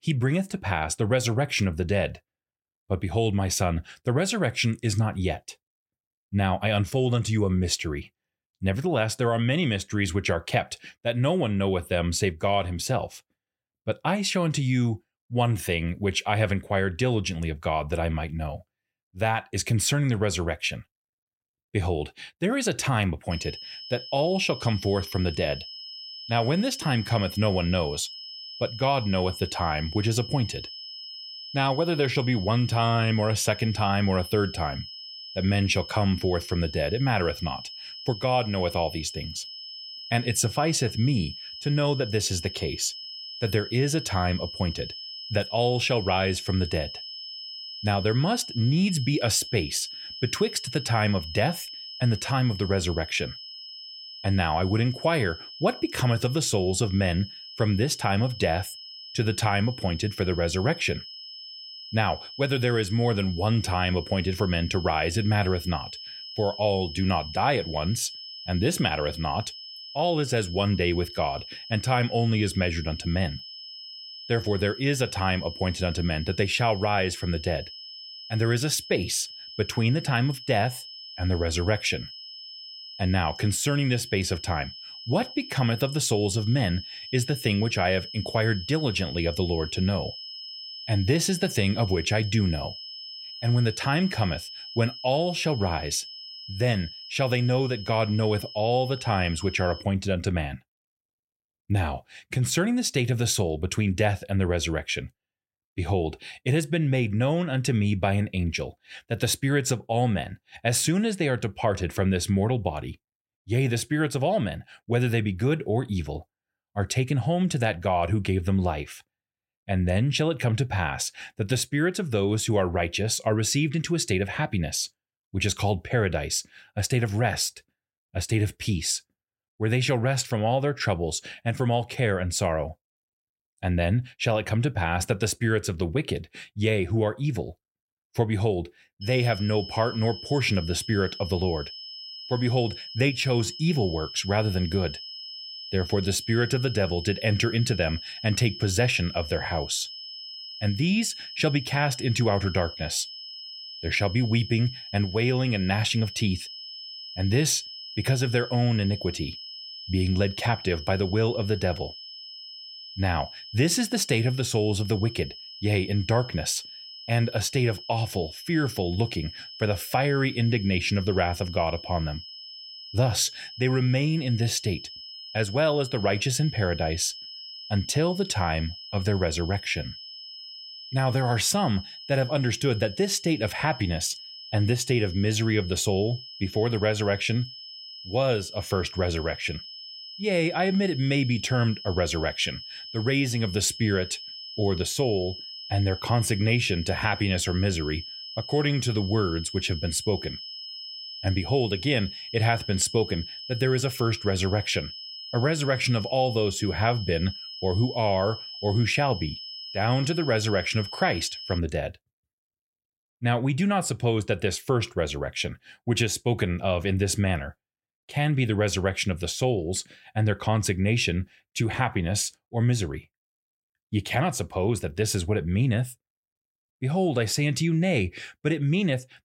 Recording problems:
high-pitched whine; noticeable; from 23 s to 1:40 and from 2:19 to 3:32; 5 kHz, 10 dB below the speech

